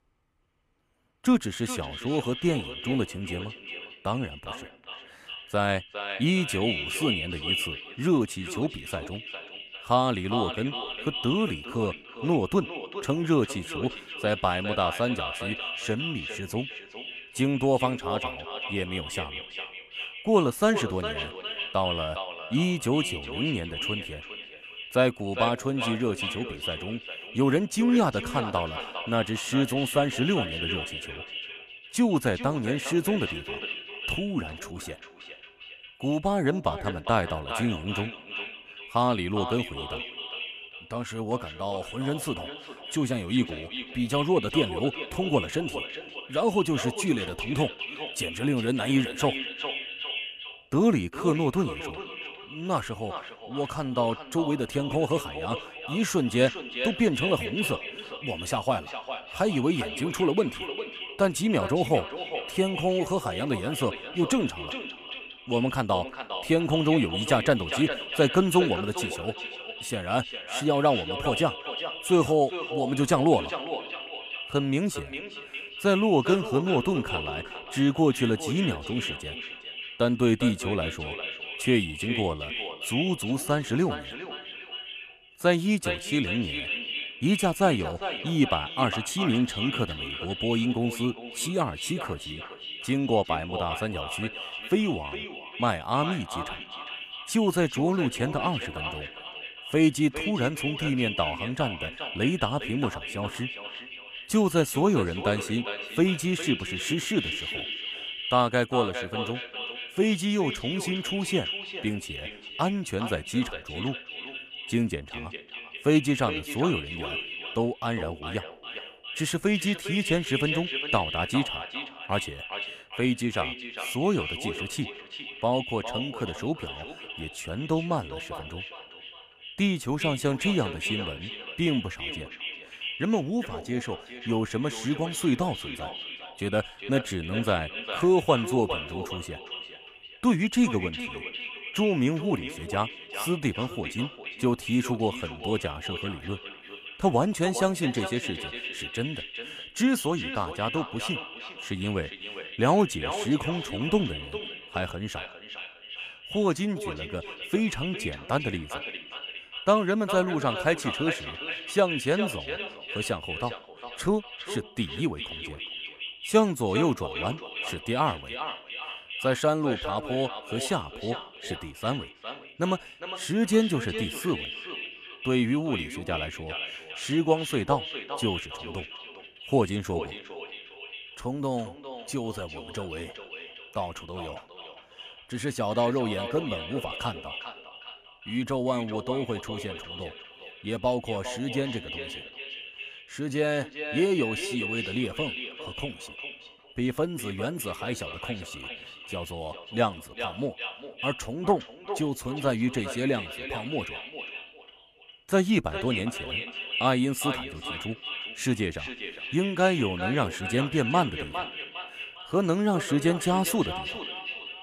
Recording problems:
echo of what is said; strong; throughout; 410 ms later, 7 dB below the speech

